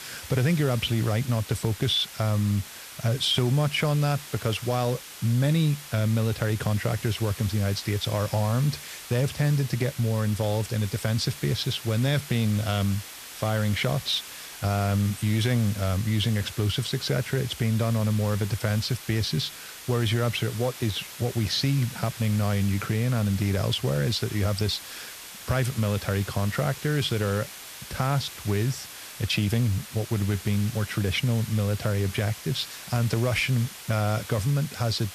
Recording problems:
hiss; noticeable; throughout; 15 dB below the speech
high-pitched whine; faint; throughout; 3.5 kHz, 30 dB below the speech

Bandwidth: 14.5 kHz